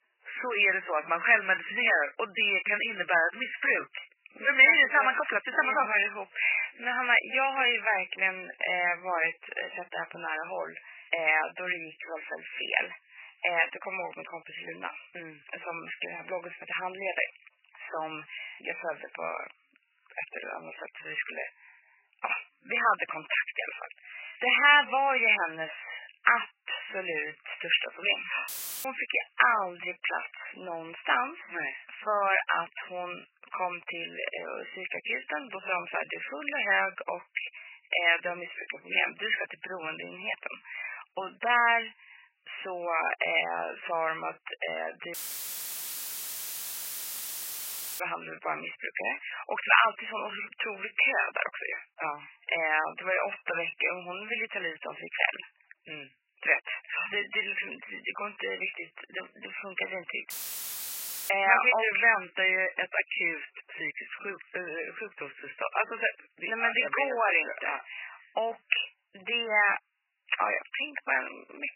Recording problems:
garbled, watery; badly; nothing above 3 kHz
thin; very; fading below 750 Hz
audio cutting out; filled with static; at 28 s, at 45 s for 3 s and at 1:00 for 1 s

